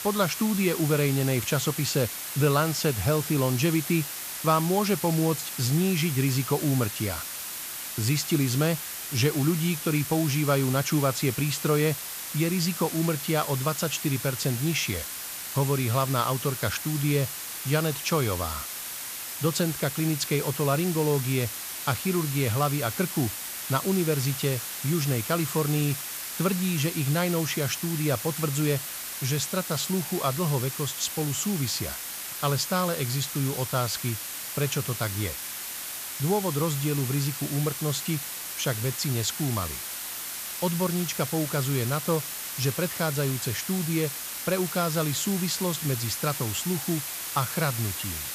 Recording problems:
hiss; loud; throughout; 5 dB below the speech

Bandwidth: 14.5 kHz